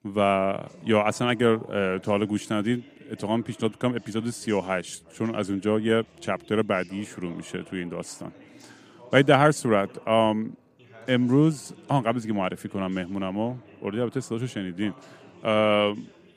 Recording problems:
background chatter; faint; throughout; 2 voices, 25 dB below the speech

